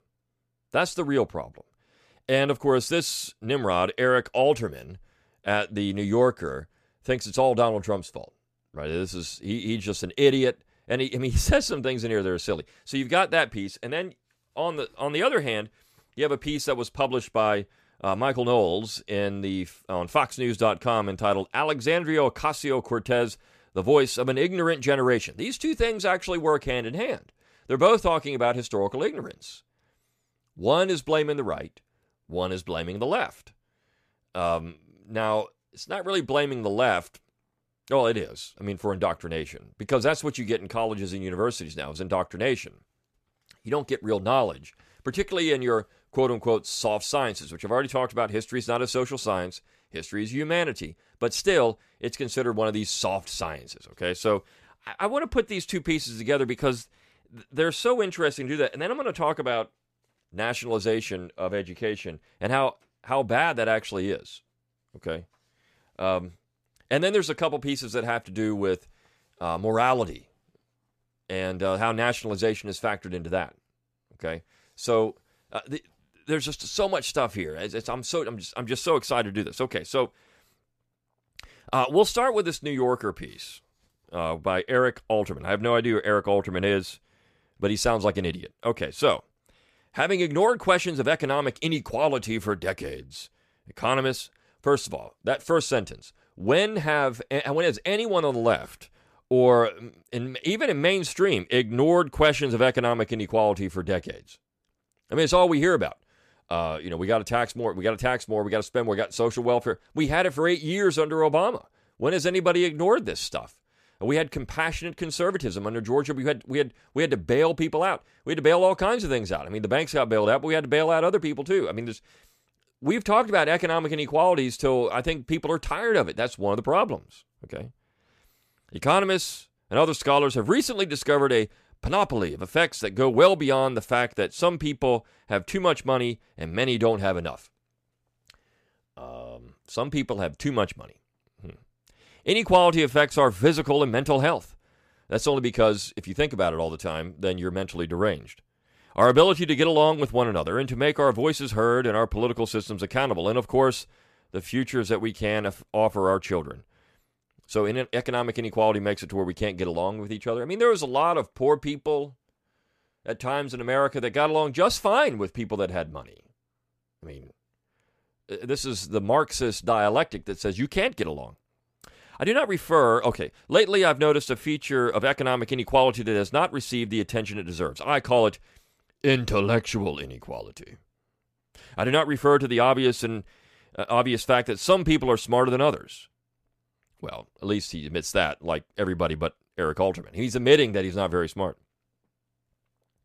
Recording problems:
none

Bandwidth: 14.5 kHz